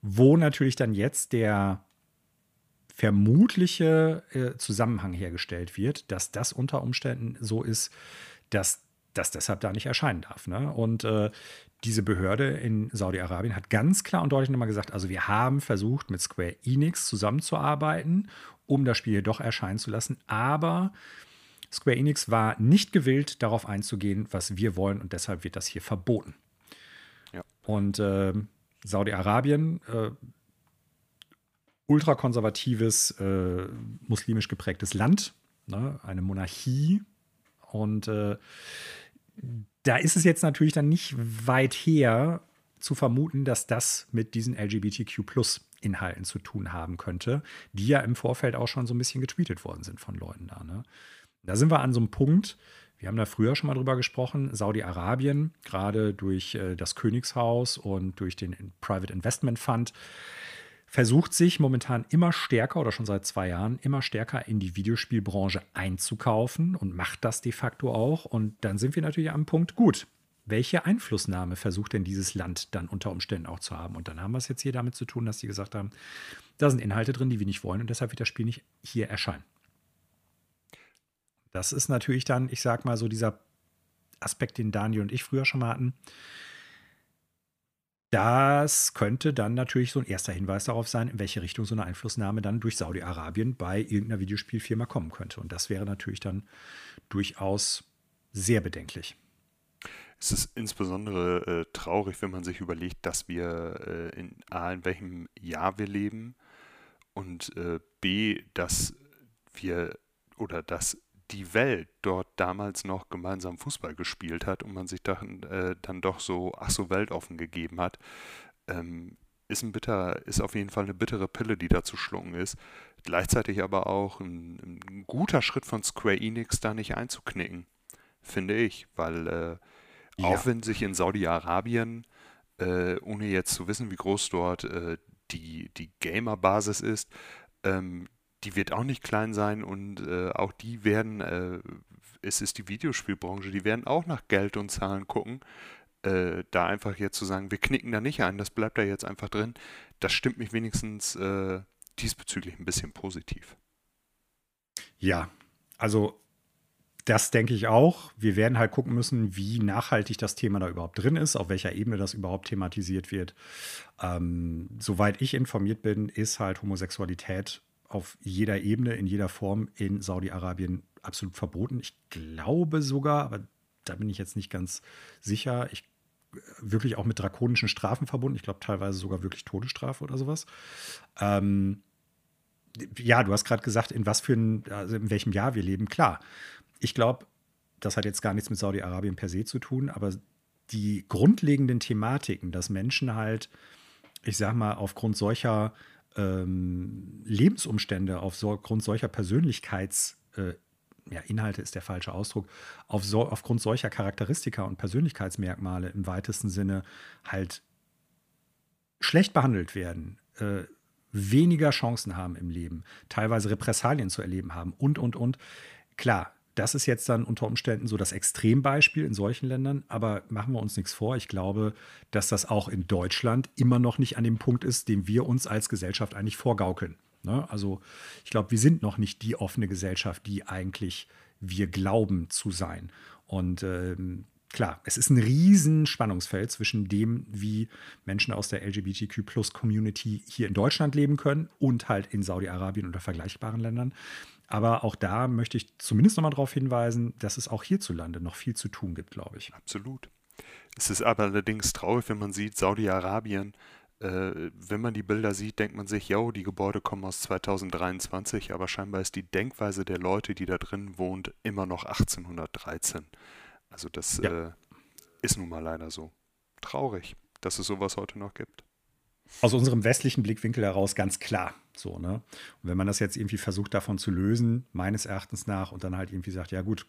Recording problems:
none

